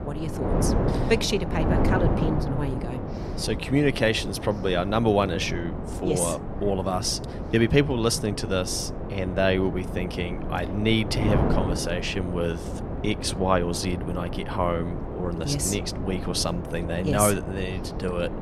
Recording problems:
wind noise on the microphone; heavy; 7 dB below the speech

